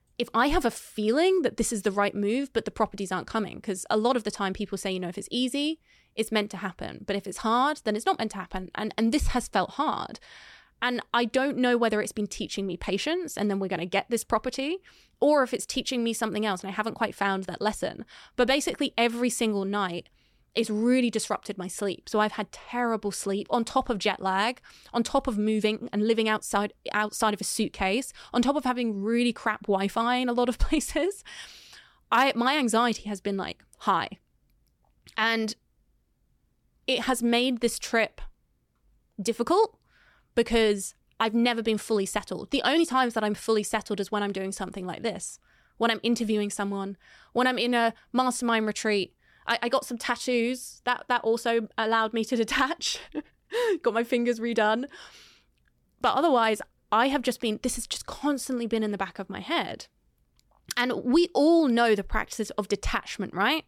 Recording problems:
none

